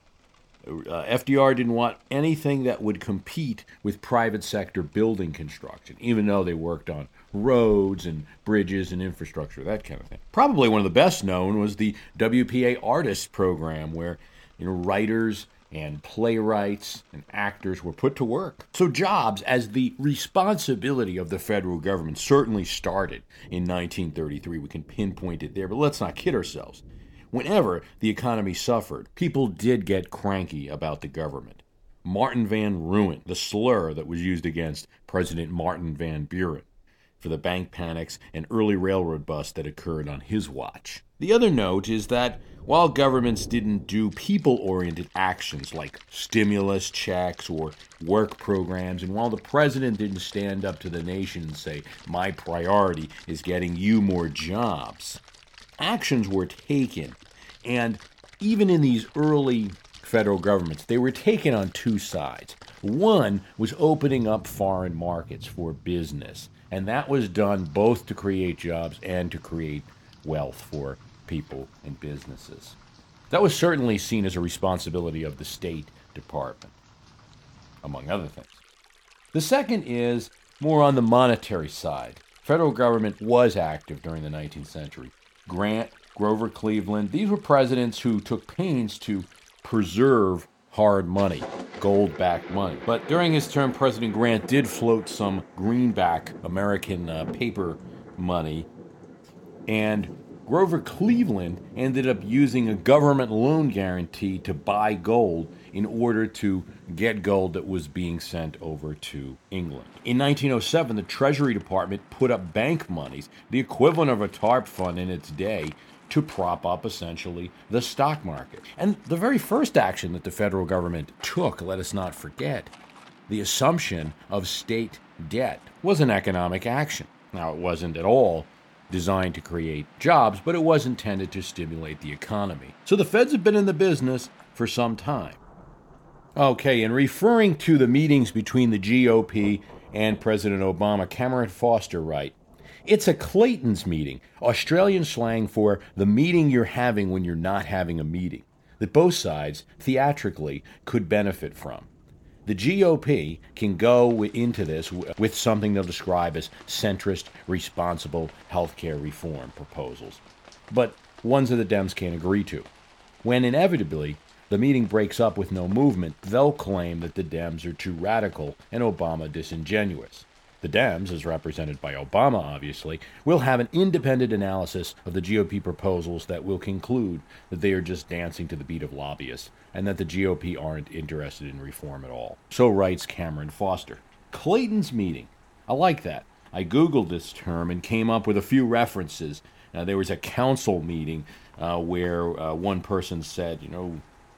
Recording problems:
rain or running water; faint; throughout; 25 dB below the speech

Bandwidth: 17 kHz